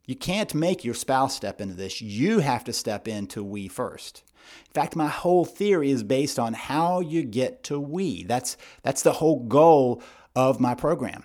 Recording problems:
none

